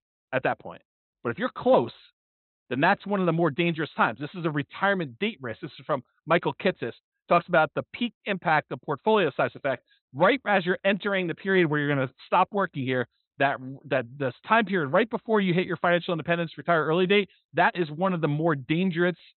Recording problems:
high frequencies cut off; severe; nothing above 4 kHz

